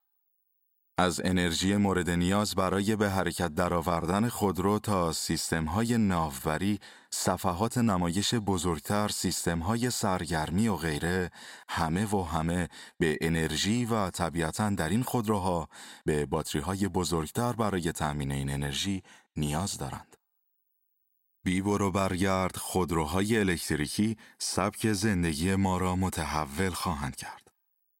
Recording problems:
none

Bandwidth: 16 kHz